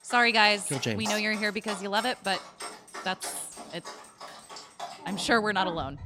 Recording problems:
animal sounds; noticeable; throughout; 15 dB below the speech

